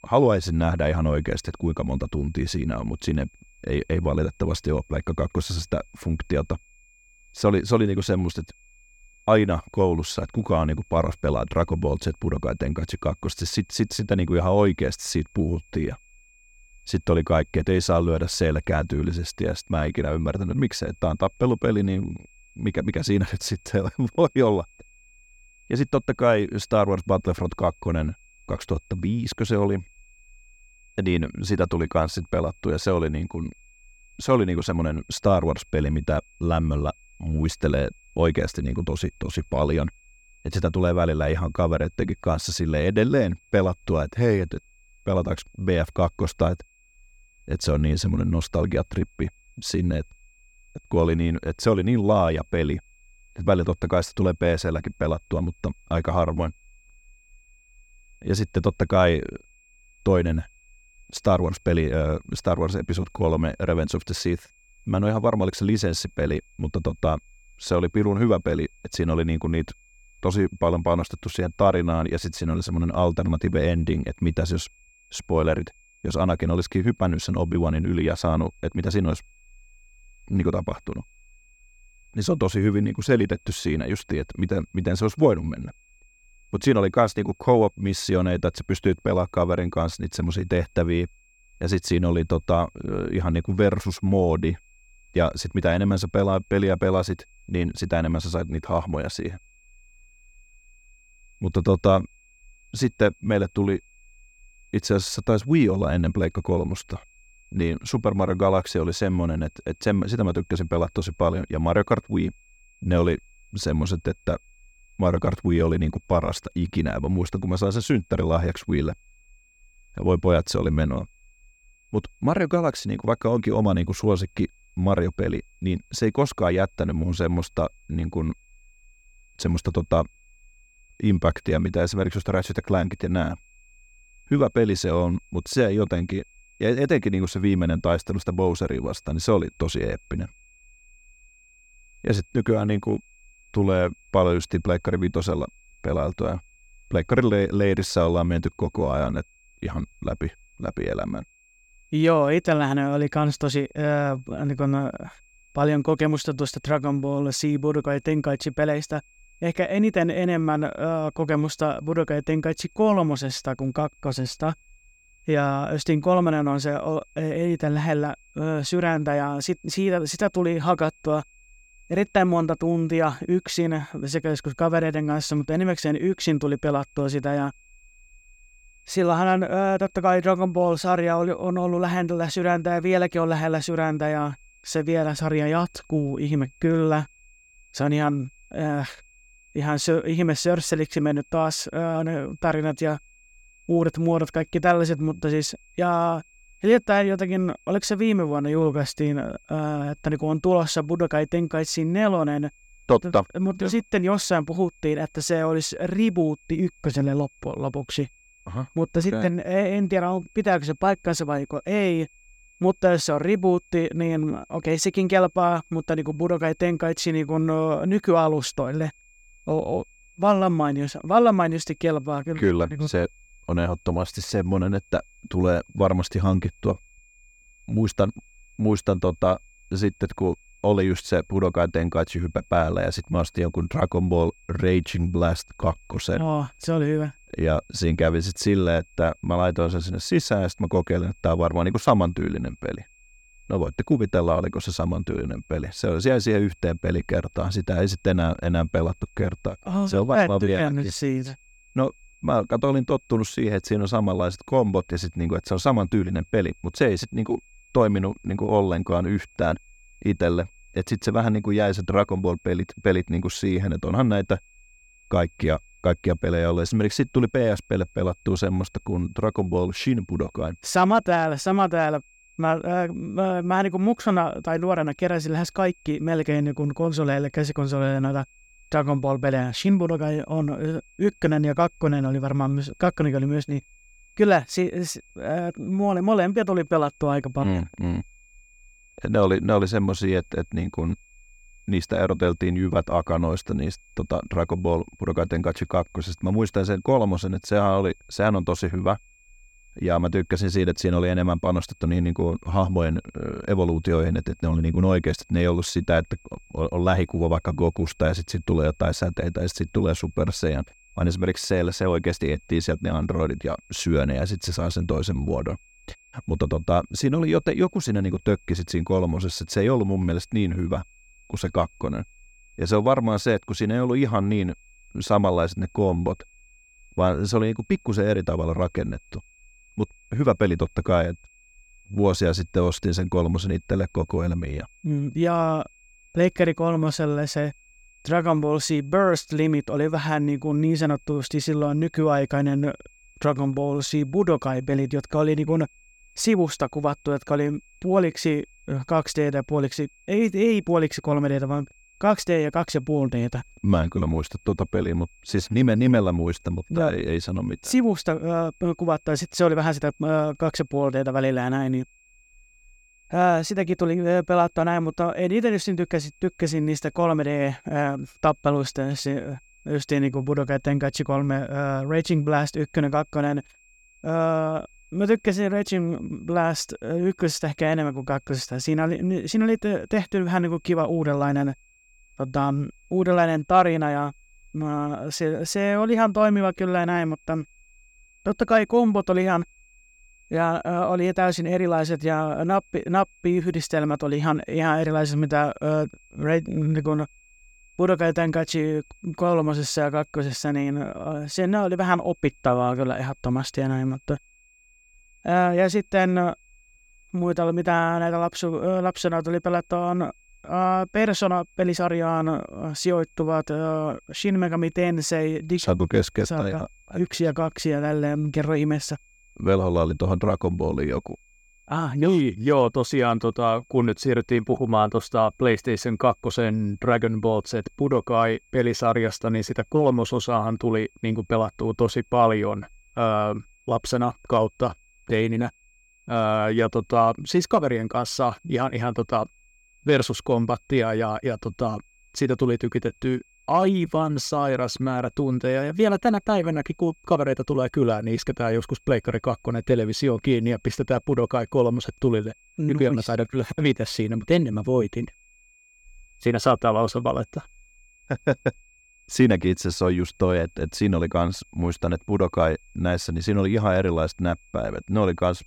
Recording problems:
high-pitched whine; faint; throughout; 2.5 kHz, 30 dB below the speech

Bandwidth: 17.5 kHz